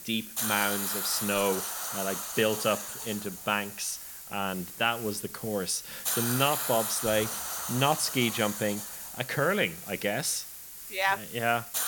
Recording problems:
hiss; loud; throughout; 4 dB below the speech

